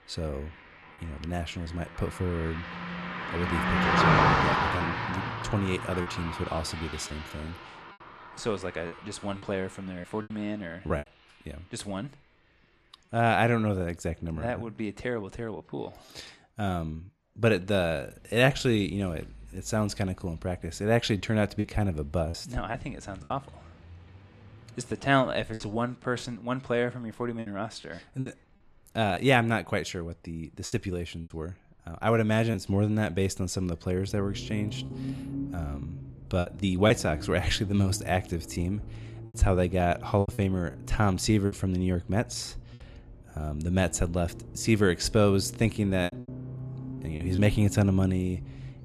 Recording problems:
traffic noise; loud; throughout; 4 dB below the speech
choppy; occasionally; 4% of the speech affected

